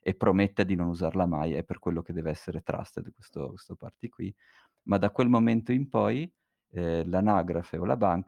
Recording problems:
none

